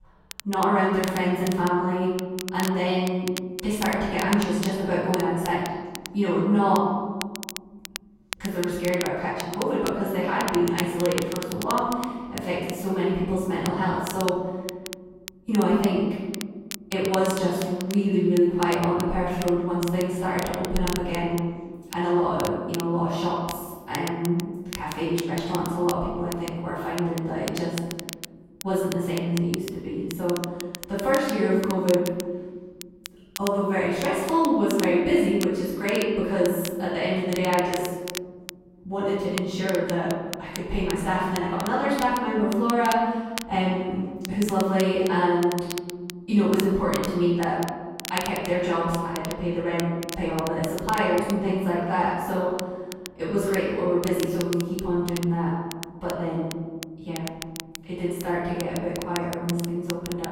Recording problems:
room echo; strong; dies away in 1.5 s
off-mic speech; far
crackle, like an old record; noticeable; 15 dB below the speech

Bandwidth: 16 kHz